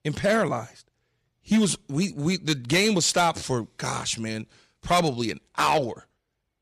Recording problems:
distortion; slight; 3% of the sound clipped

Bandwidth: 14.5 kHz